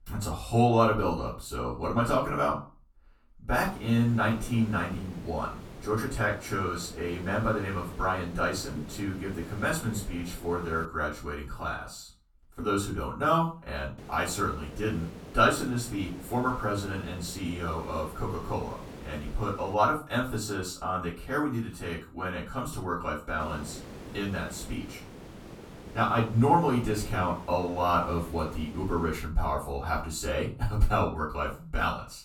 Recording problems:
off-mic speech; far
room echo; slight; dies away in 0.3 s
hiss; noticeable; from 3.5 to 11 s, from 14 to 20 s and from 23 to 29 s; 15 dB below the speech

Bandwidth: 18 kHz